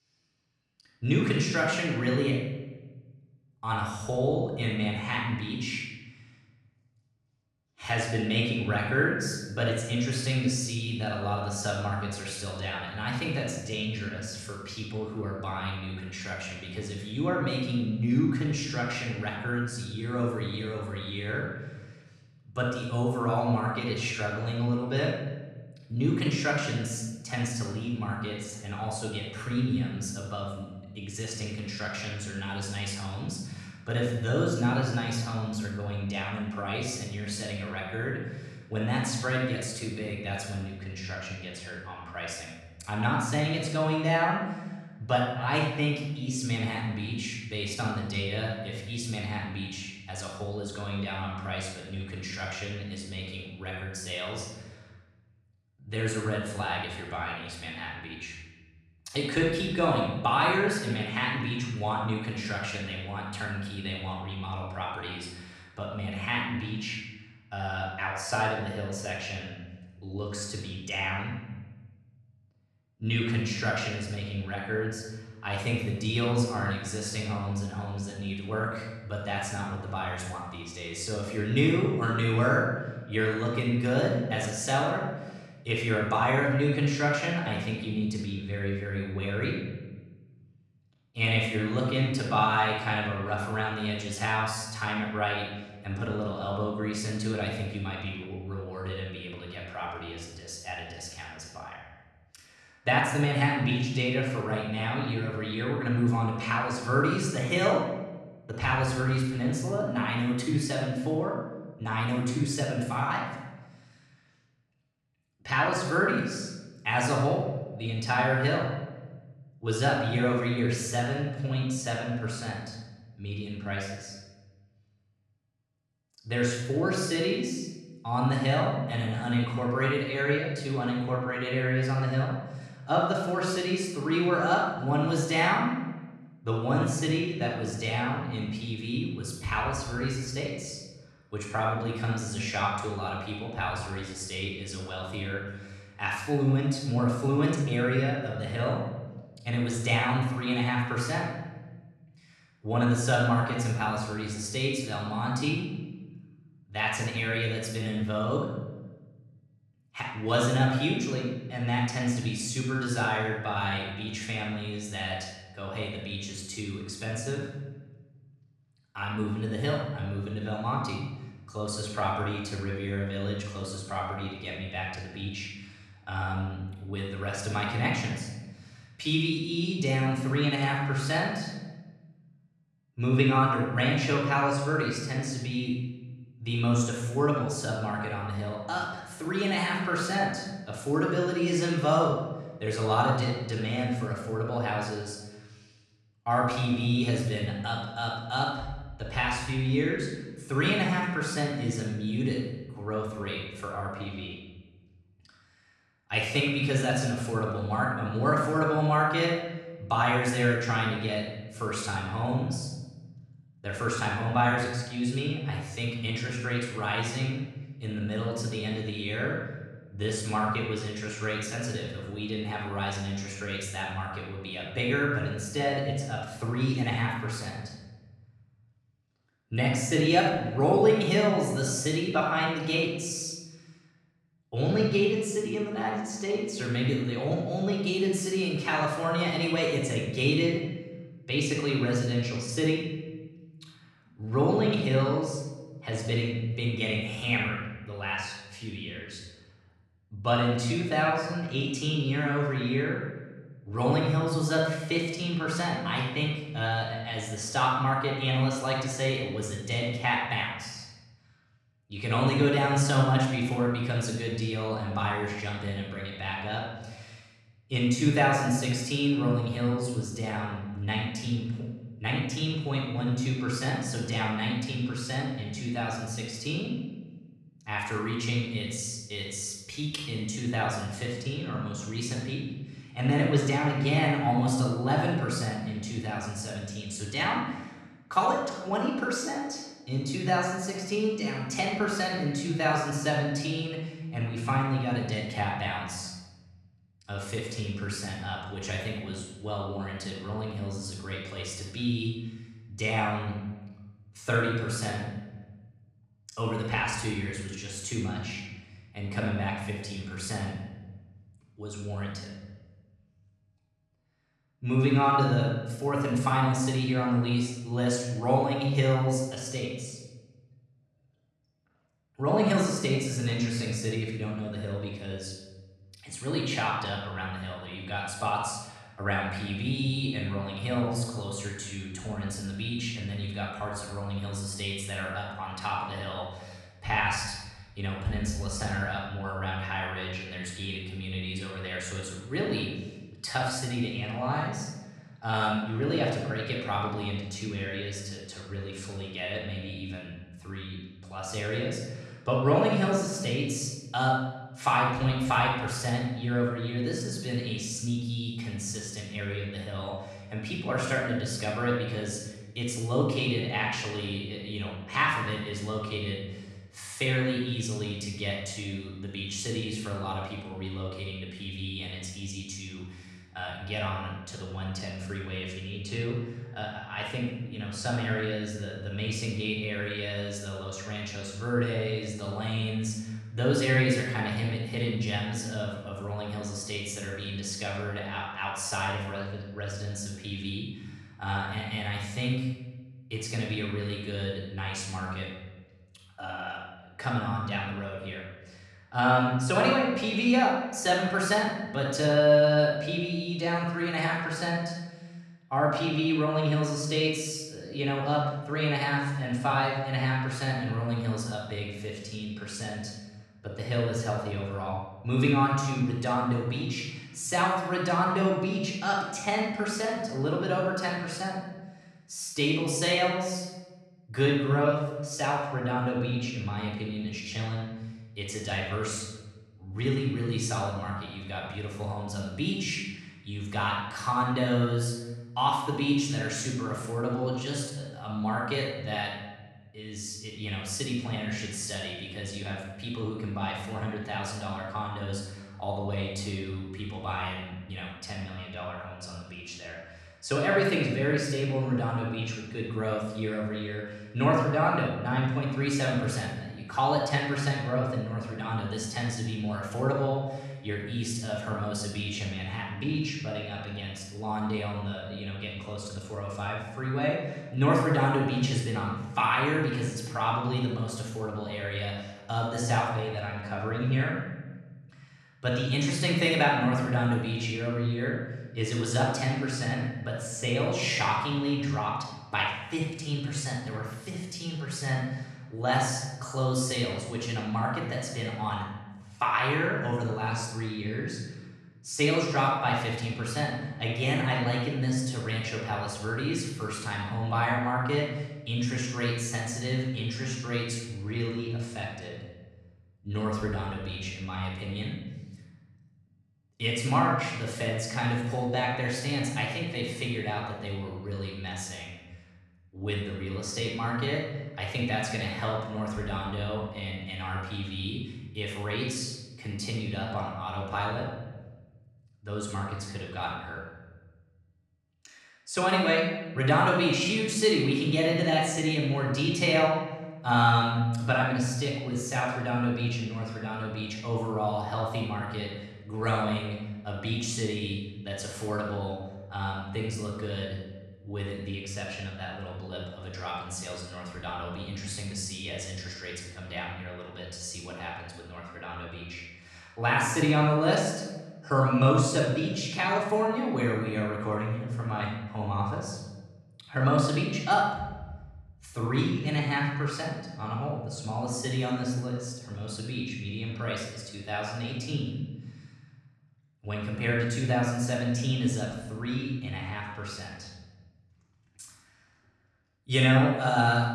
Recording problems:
off-mic speech; far
room echo; noticeable; dies away in 1.1 s

